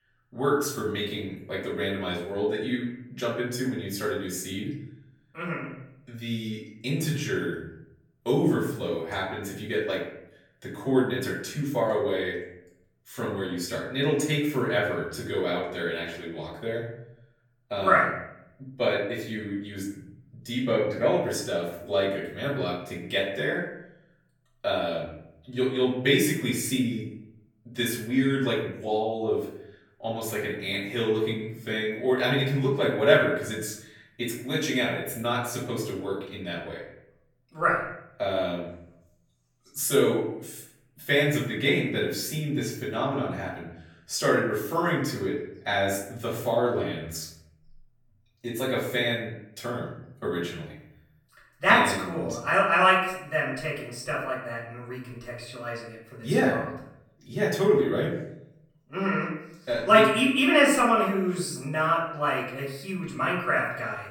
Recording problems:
off-mic speech; far
room echo; noticeable; dies away in 0.7 s

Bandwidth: 17.5 kHz